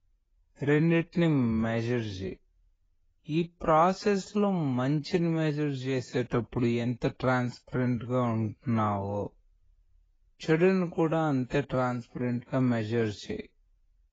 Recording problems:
garbled, watery; badly; nothing above 7.5 kHz
wrong speed, natural pitch; too slow; 0.6 times normal speed

